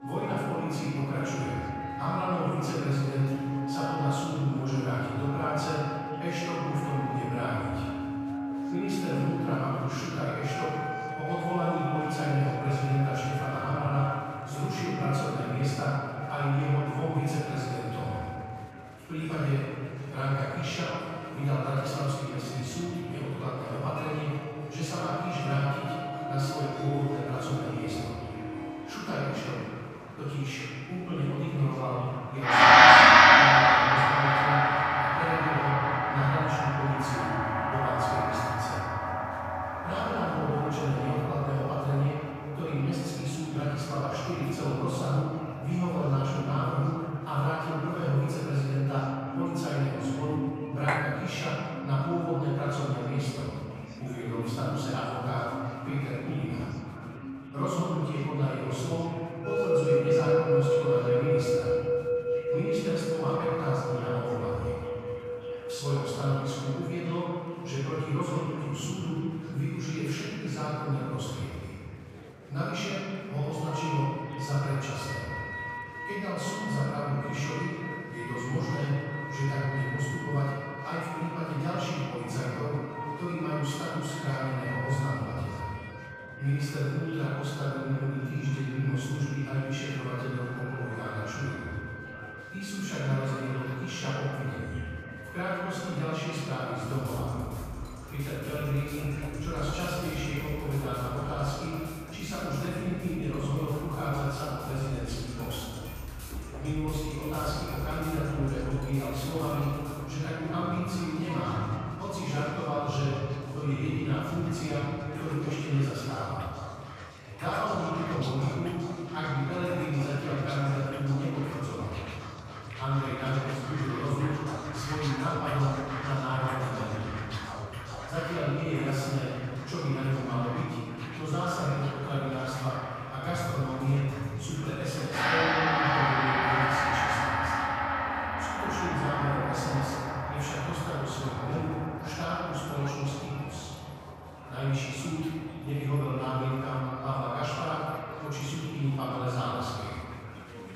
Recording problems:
room echo; strong; dies away in 2.2 s
off-mic speech; far
background music; very loud; throughout; 3 dB above the speech
murmuring crowd; noticeable; throughout; 15 dB below the speech
clattering dishes; loud; at 51 s; peak 1 dB above the speech

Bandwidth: 14.5 kHz